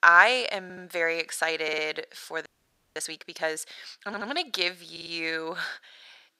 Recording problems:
thin; very; fading below 500 Hz
audio stuttering; 4 times, first at 0.5 s
audio freezing; at 2.5 s for 0.5 s

